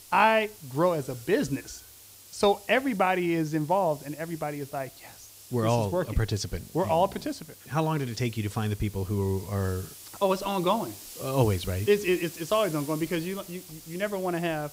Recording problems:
hiss; noticeable; throughout; 15 dB below the speech

